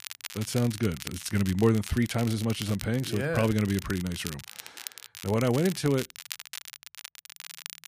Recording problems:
crackle, like an old record; noticeable; 15 dB below the speech

